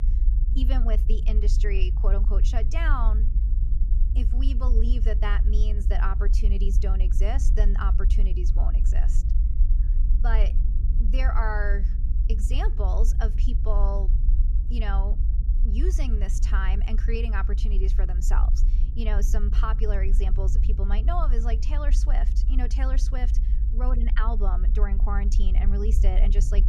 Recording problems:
low rumble; noticeable; throughout; 10 dB below the speech

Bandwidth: 14.5 kHz